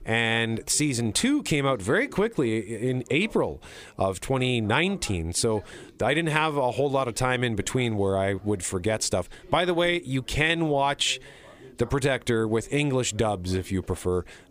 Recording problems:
background chatter; faint; throughout; 2 voices, 25 dB below the speech

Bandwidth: 15 kHz